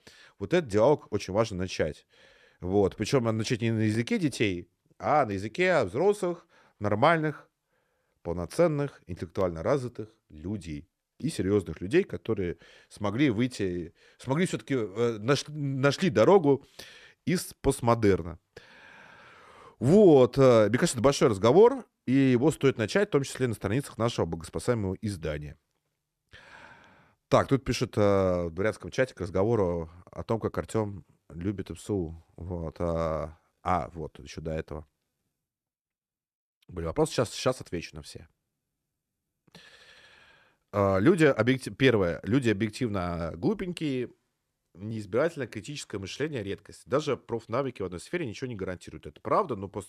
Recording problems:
none

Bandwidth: 14 kHz